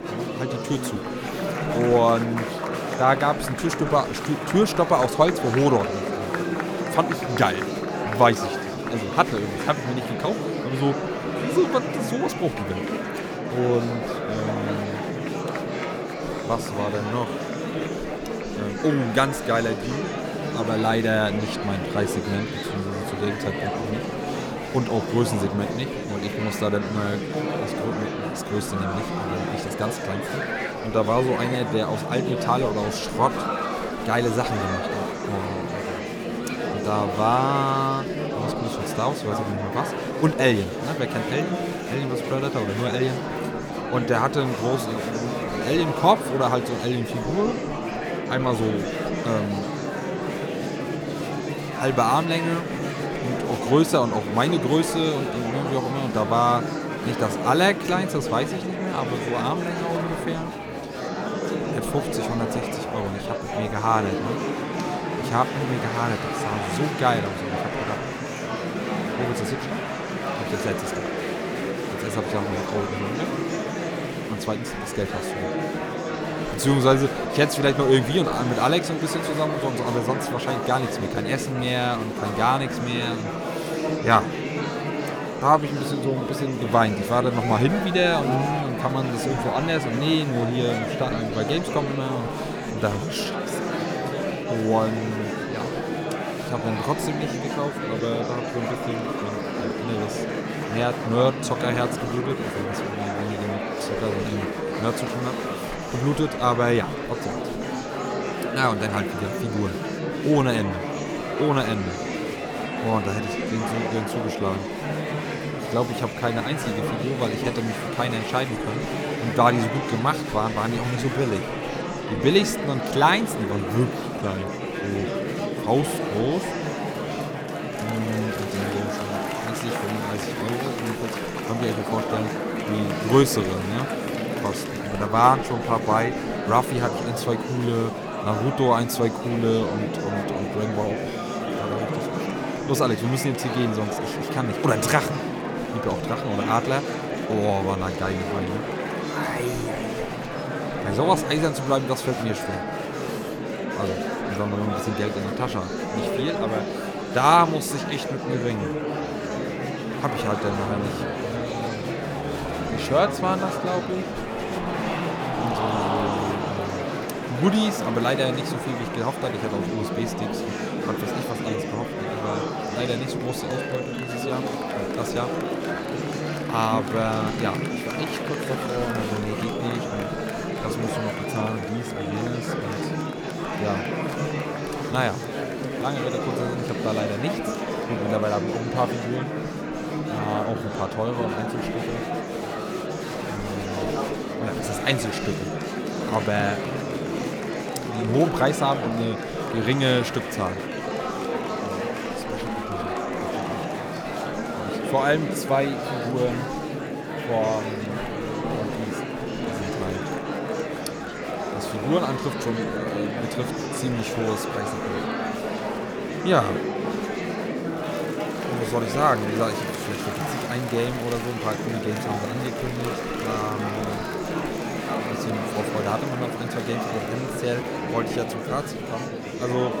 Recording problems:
murmuring crowd; loud; throughout; 2 dB below the speech

